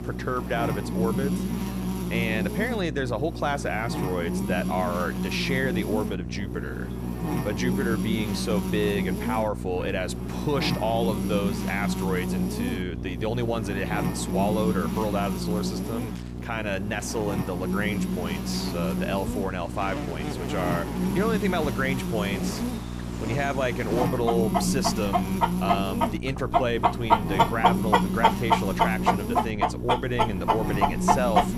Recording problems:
animal sounds; very loud; throughout; 1 dB above the speech
electrical hum; loud; throughout; 60 Hz, 6 dB below the speech

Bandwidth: 14.5 kHz